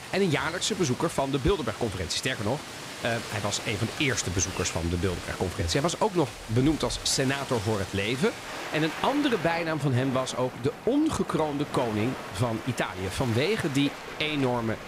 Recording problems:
rain or running water; loud; throughout; 10 dB below the speech

